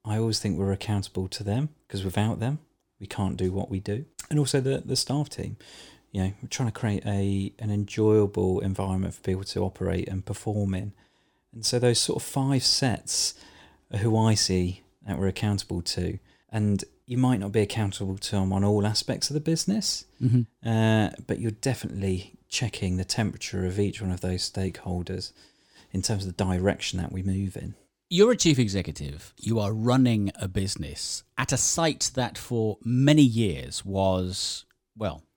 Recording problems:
none

